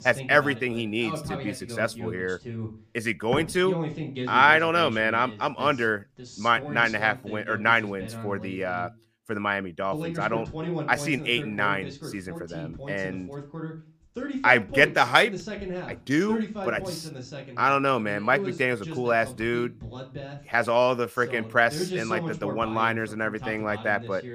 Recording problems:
voice in the background; noticeable; throughout; 10 dB below the speech

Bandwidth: 15 kHz